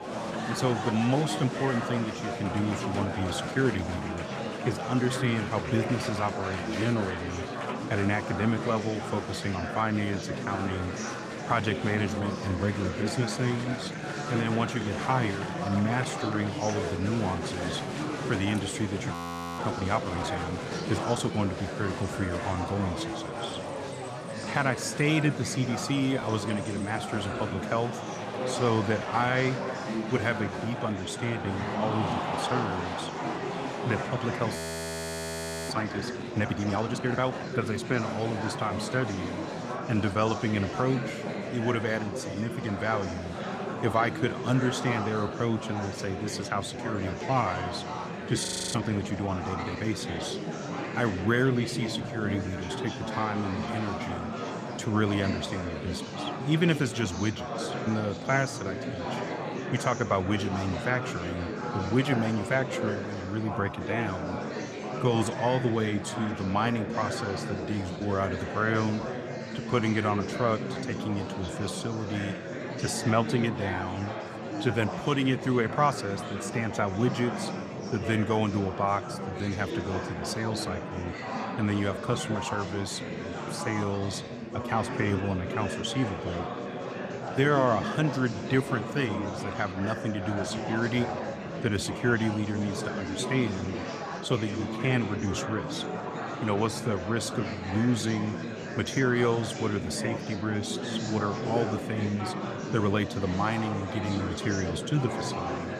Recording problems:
murmuring crowd; loud; throughout; 4 dB below the speech
audio freezing; at 19 s, at 35 s for 1 s and at 48 s

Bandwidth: 14.5 kHz